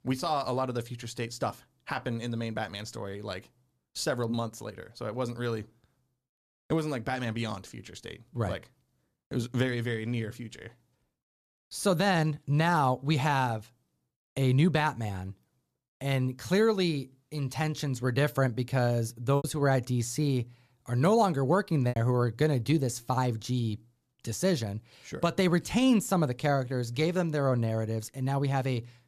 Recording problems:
choppy; occasionally; from 19 to 22 s; 2% of the speech affected

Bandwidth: 14.5 kHz